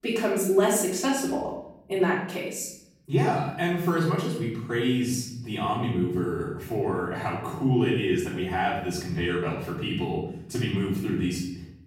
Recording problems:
off-mic speech; far
room echo; noticeable; dies away in 0.9 s

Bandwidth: 16 kHz